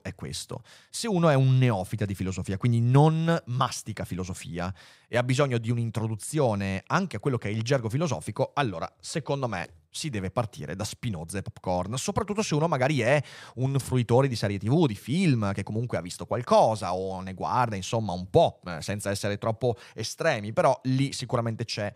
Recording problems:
none

